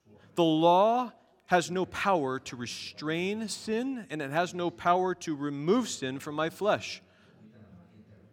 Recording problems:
background chatter; faint; throughout; 4 voices, 30 dB below the speech

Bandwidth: 17 kHz